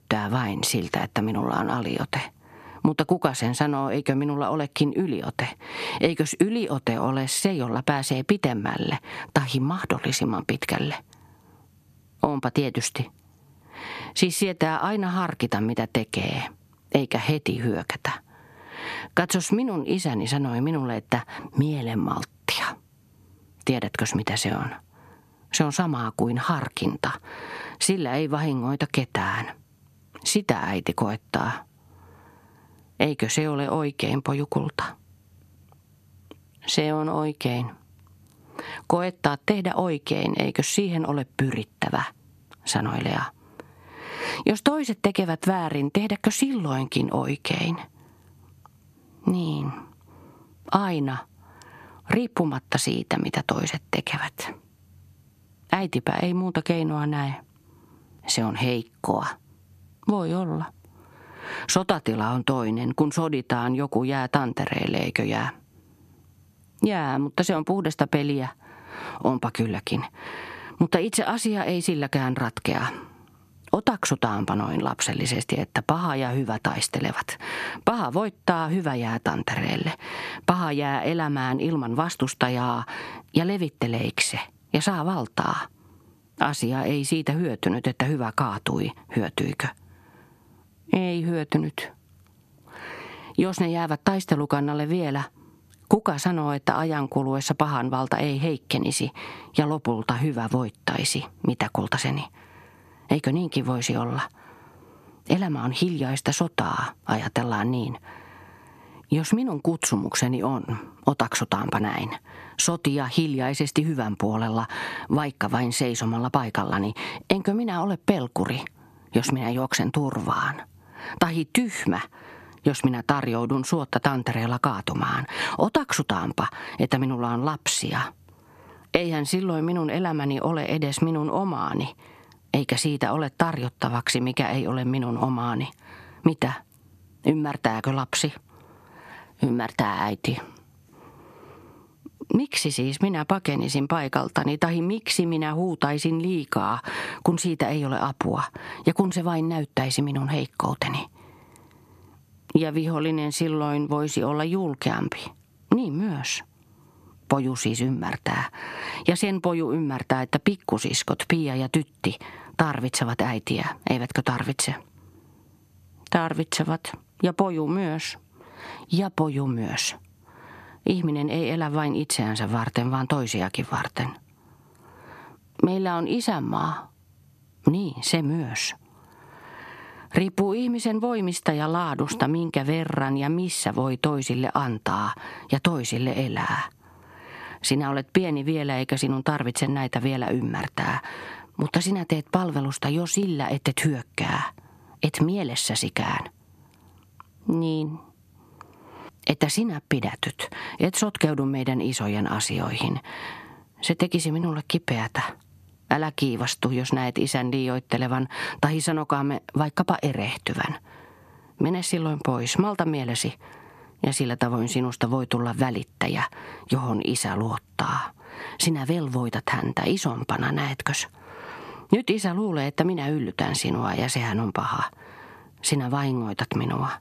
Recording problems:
squashed, flat; heavily

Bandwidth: 14 kHz